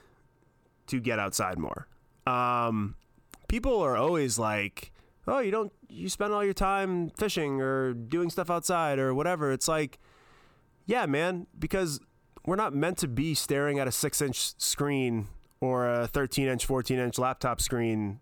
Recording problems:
squashed, flat; heavily

